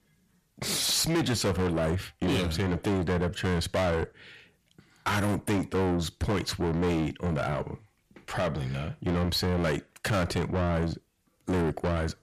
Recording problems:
distortion; heavy; 6 dB below the speech

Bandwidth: 14.5 kHz